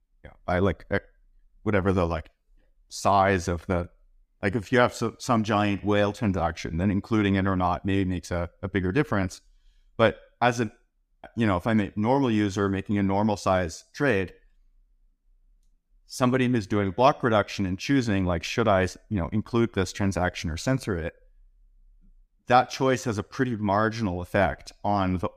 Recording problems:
none

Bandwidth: 15 kHz